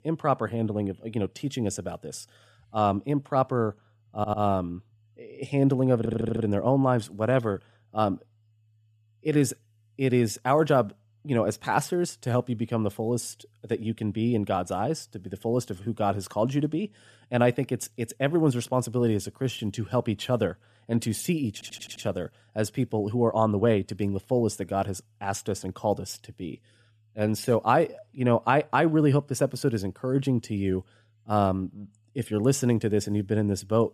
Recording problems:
audio stuttering; at 4 s, at 6 s and at 22 s

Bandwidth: 14.5 kHz